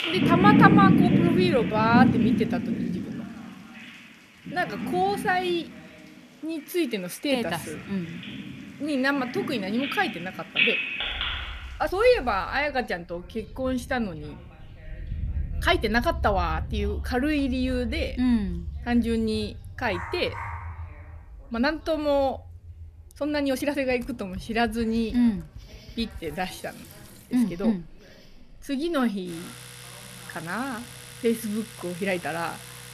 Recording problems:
animal sounds; loud; throughout; as loud as the speech
household noises; noticeable; from 24 s on; 15 dB below the speech
rain or running water; faint; throughout; 25 dB below the speech
voice in the background; faint; throughout; 30 dB below the speech
uneven, jittery; strongly; from 1.5 to 32 s
dog barking; faint; at 20 s; peak 10 dB below the speech

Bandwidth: 14.5 kHz